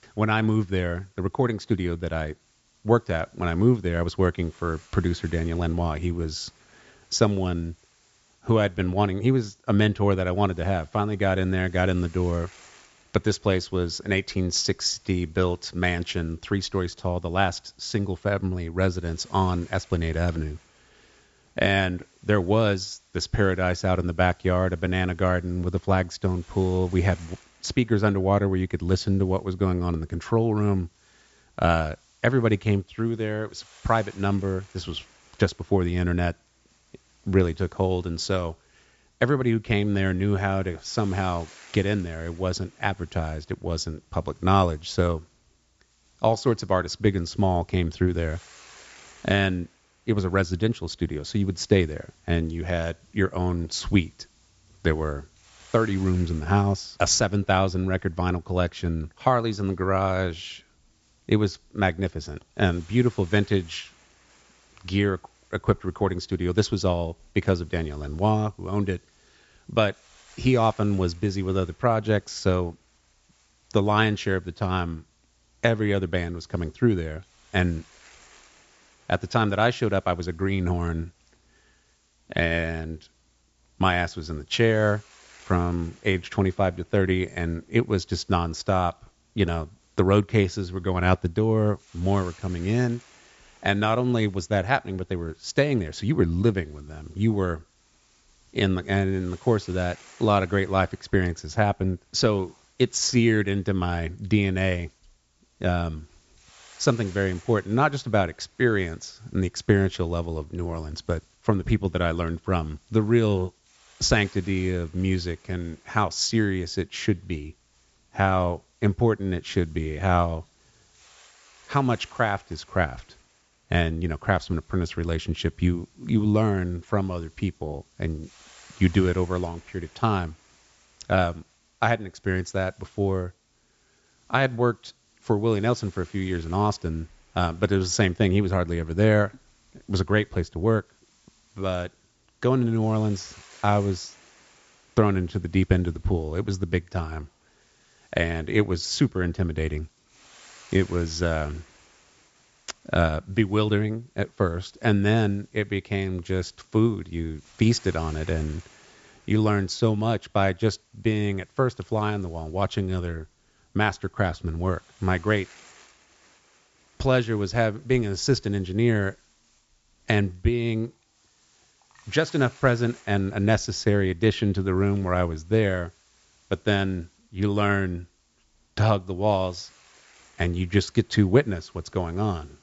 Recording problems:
high frequencies cut off; noticeable; nothing above 8 kHz
hiss; faint; throughout; 30 dB below the speech

